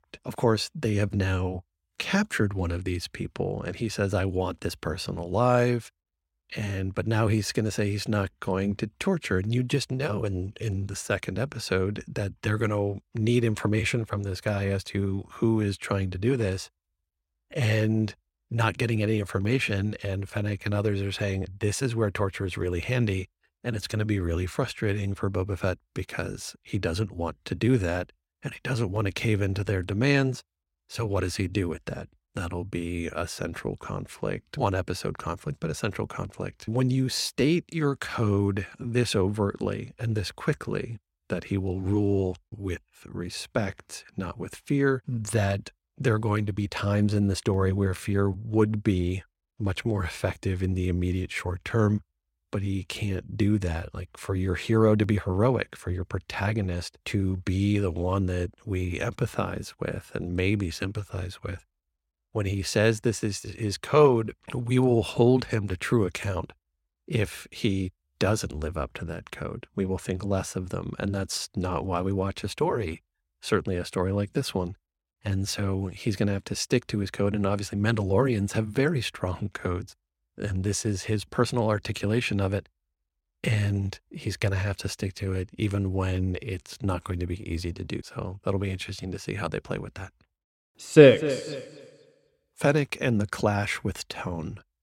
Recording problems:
none

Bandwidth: 16.5 kHz